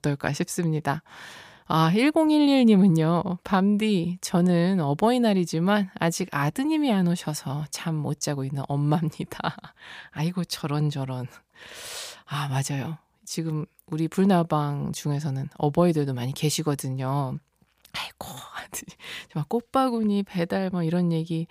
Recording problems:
none

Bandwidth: 15 kHz